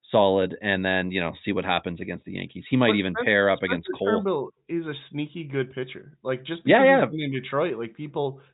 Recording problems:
high frequencies cut off; severe; nothing above 4 kHz

